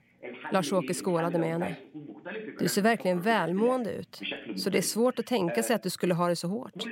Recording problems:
voice in the background; noticeable; throughout; 10 dB below the speech

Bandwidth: 16 kHz